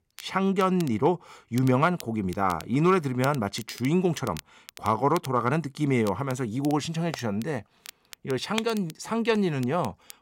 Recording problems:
crackle, like an old record; noticeable; 20 dB below the speech

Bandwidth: 16 kHz